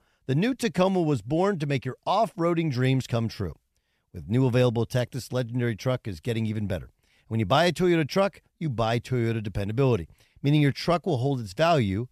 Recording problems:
none

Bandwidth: 14.5 kHz